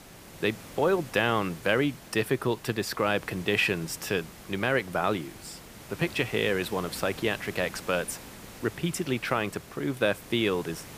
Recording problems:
hiss; noticeable; throughout; 15 dB below the speech

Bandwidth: 15 kHz